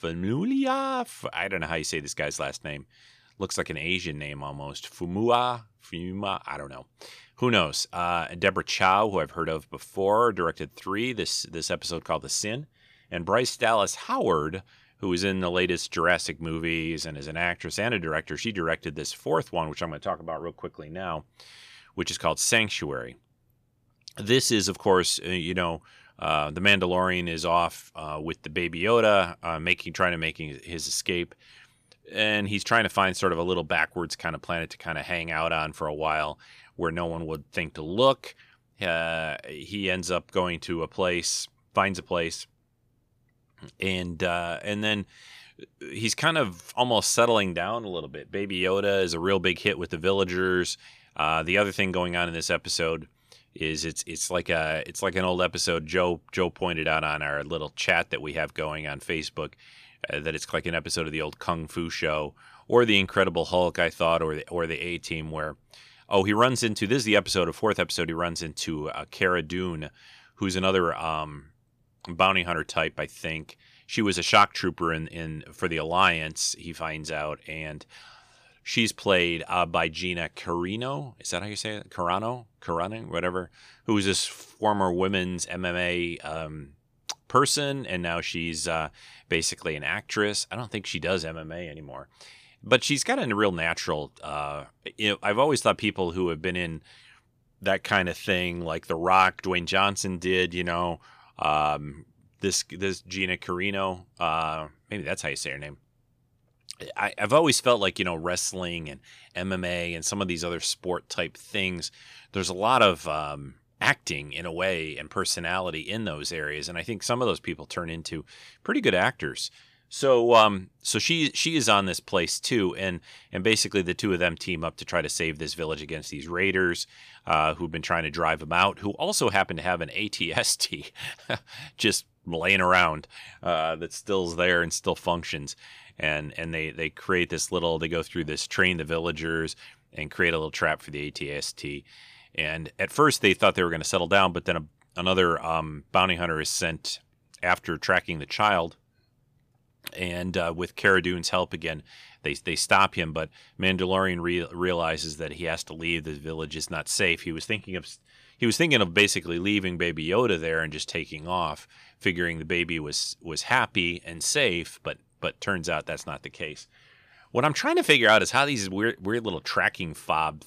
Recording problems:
none

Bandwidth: 15 kHz